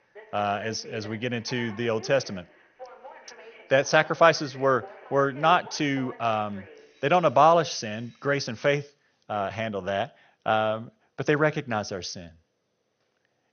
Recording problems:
garbled, watery; slightly; nothing above 6.5 kHz
alarms or sirens; faint; until 8.5 s; 20 dB below the speech

